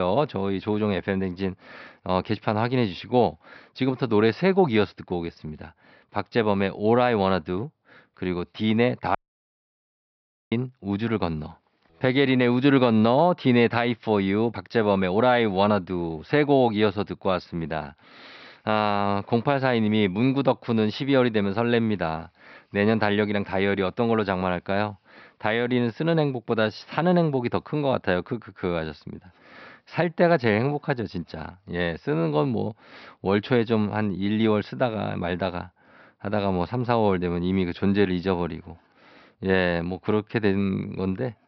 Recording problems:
high frequencies cut off; noticeable; nothing above 5.5 kHz
abrupt cut into speech; at the start
audio cutting out; at 9 s for 1.5 s

